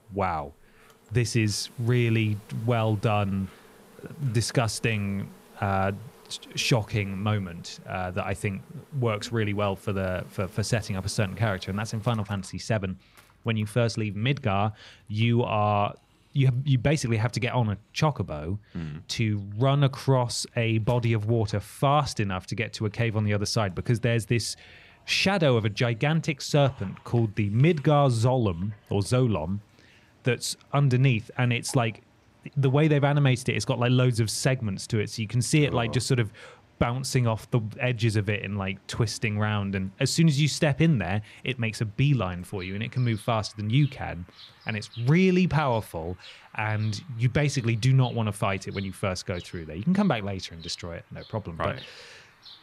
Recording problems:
animal sounds; faint; throughout; 25 dB below the speech

